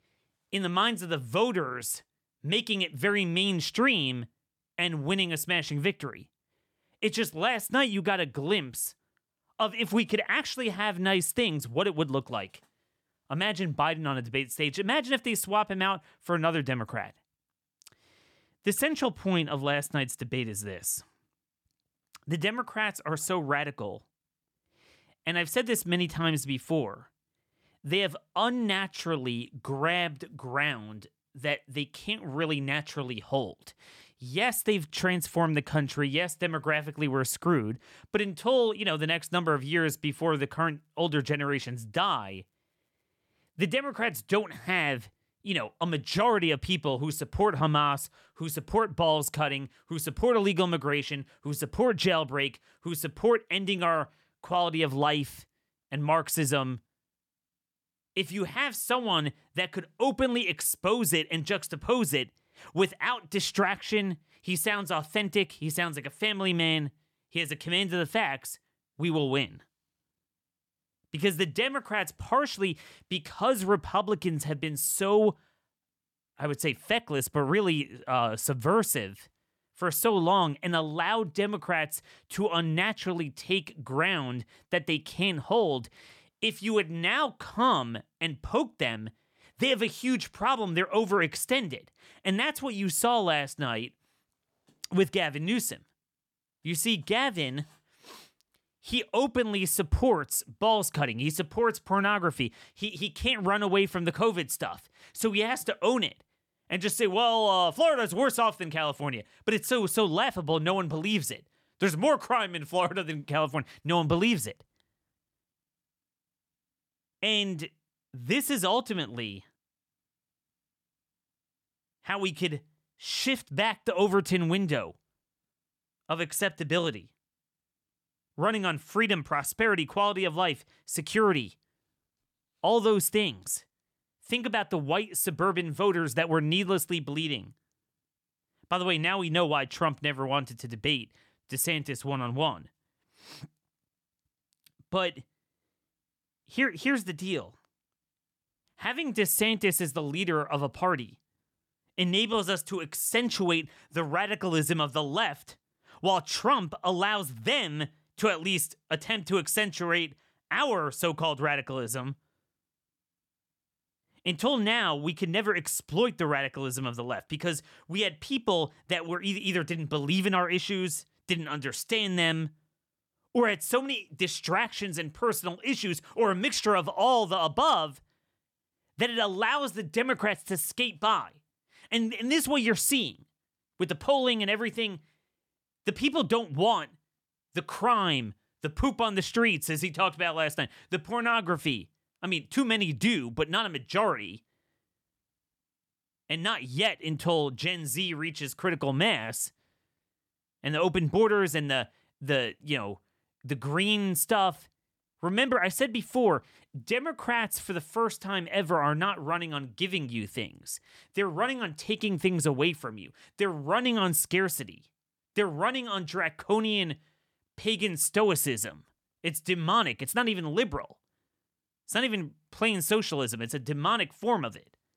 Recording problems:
none

